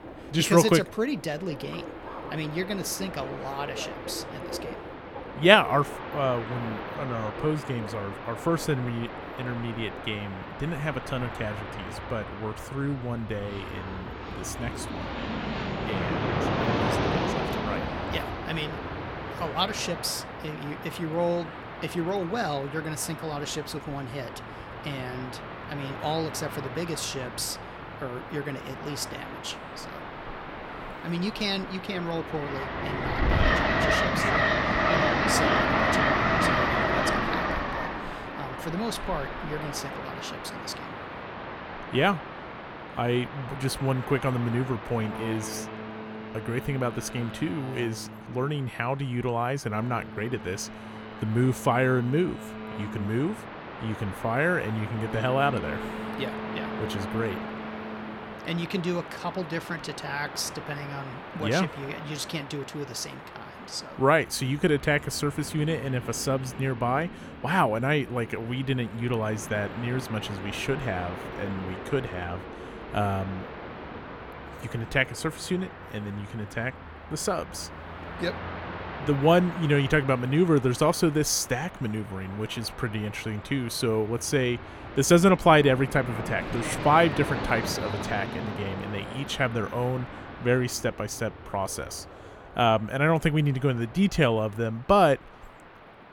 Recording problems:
train or aircraft noise; loud; throughout; 5 dB below the speech

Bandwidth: 17 kHz